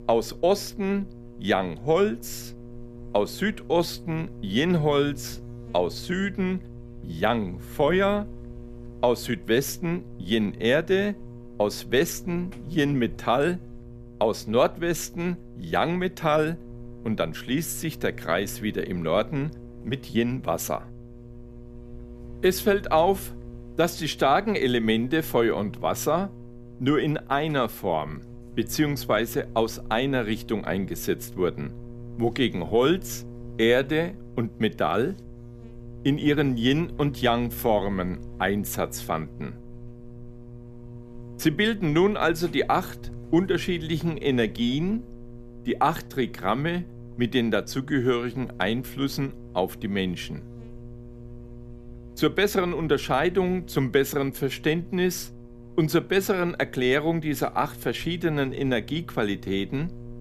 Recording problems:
electrical hum; faint; throughout; 60 Hz, 20 dB below the speech

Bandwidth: 14.5 kHz